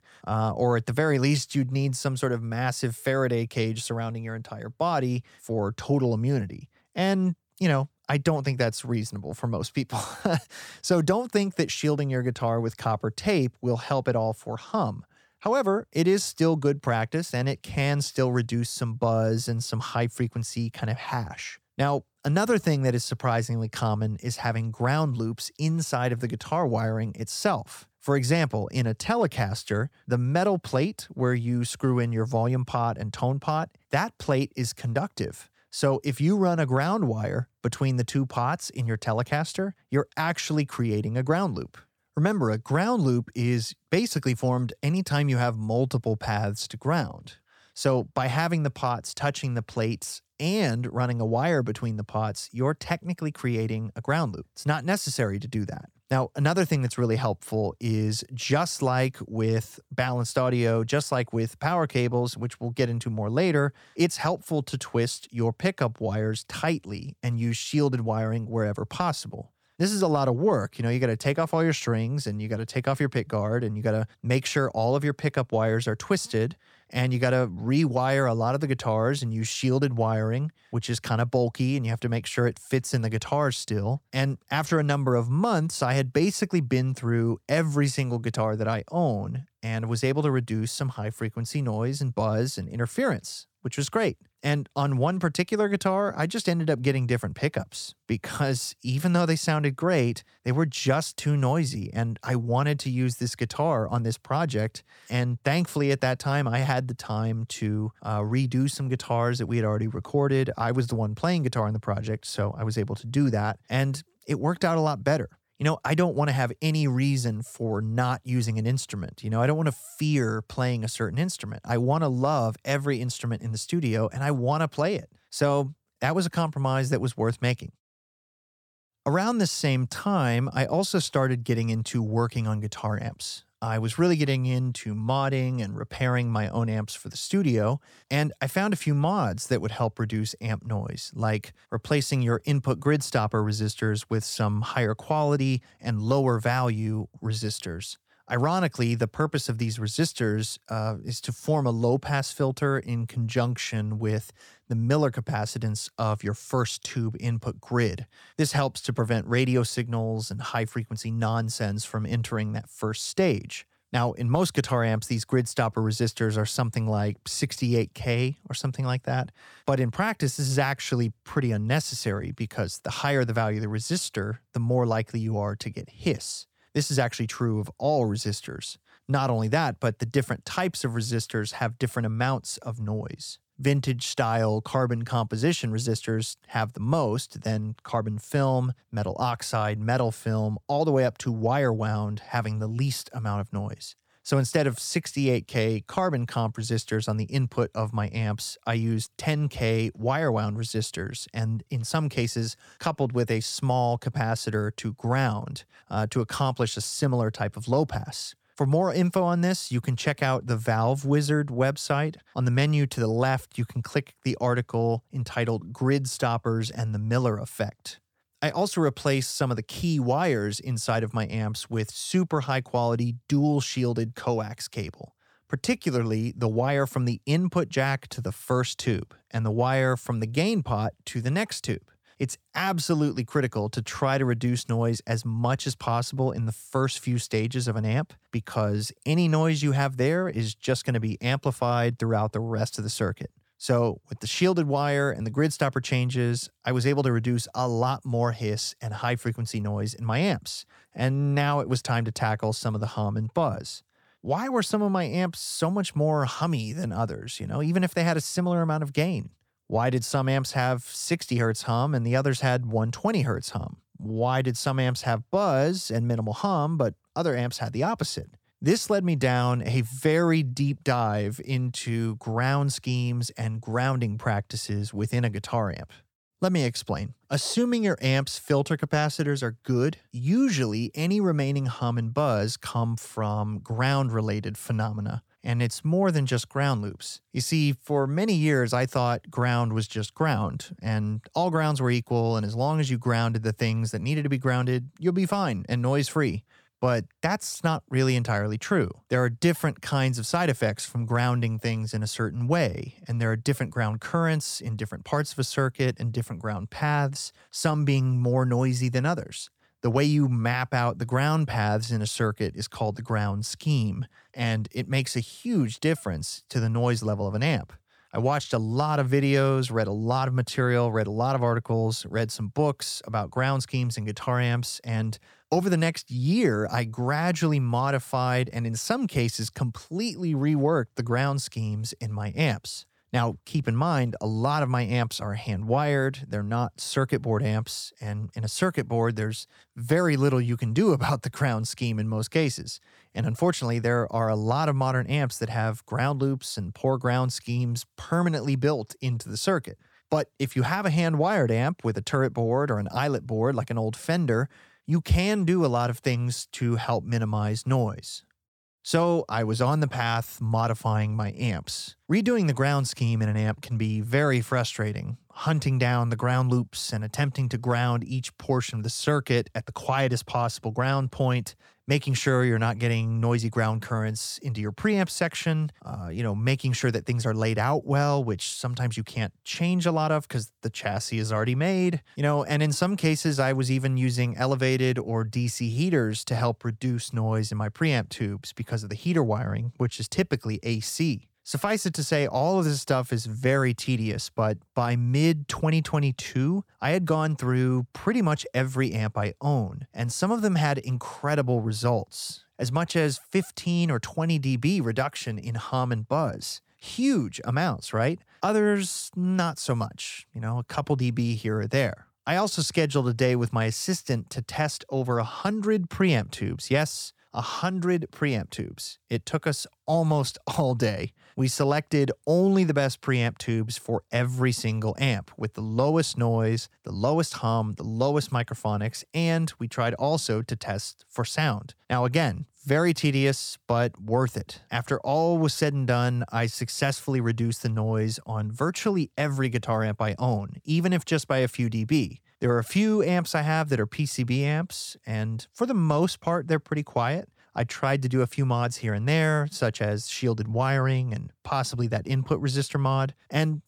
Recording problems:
none

